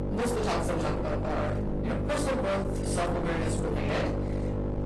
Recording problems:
distortion; heavy; 44% of the sound clipped
room echo; slight; dies away in 0.4 s
off-mic speech; somewhat distant
garbled, watery; slightly
electrical hum; loud; throughout; 50 Hz, 5 dB below the speech

